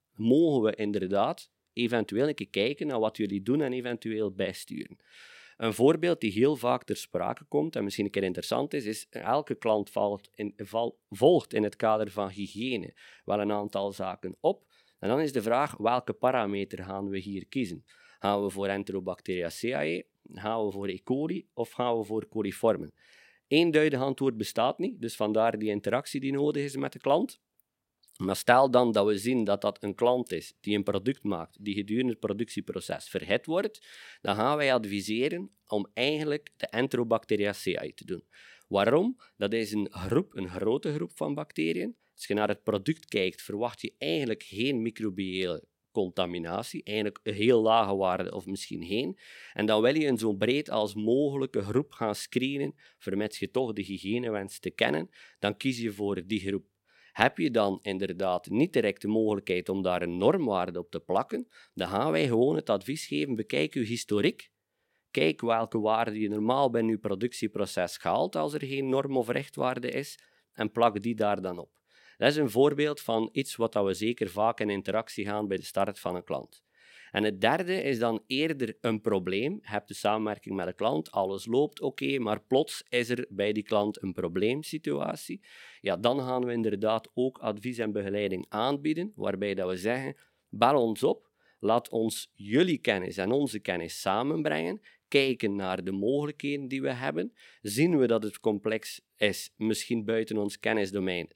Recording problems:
none

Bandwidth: 16.5 kHz